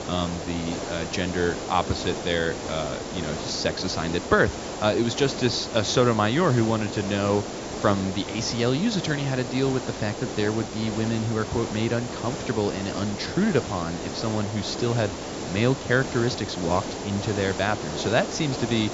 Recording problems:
high frequencies cut off; noticeable; nothing above 7.5 kHz
hiss; loud; throughout; 7 dB below the speech

